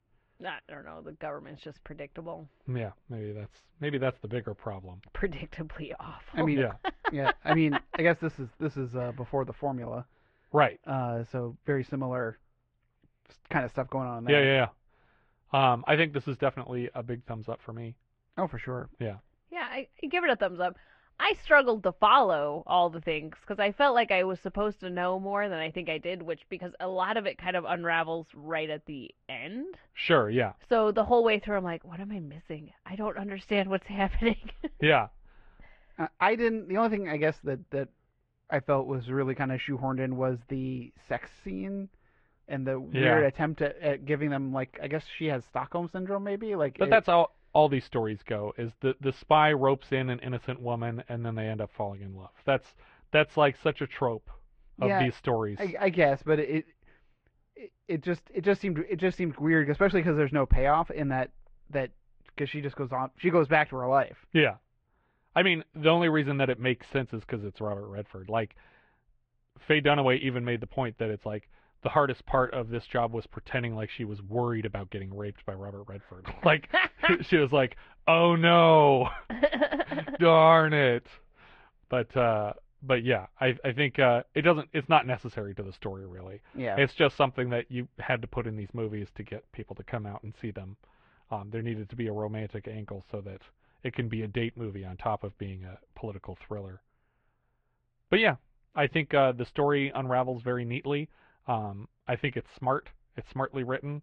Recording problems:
muffled; very; fading above 3 kHz
garbled, watery; slightly

